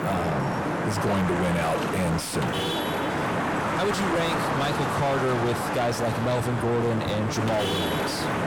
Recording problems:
distortion; heavy; 6 dB below the speech
traffic noise; loud; throughout; 1 dB below the speech

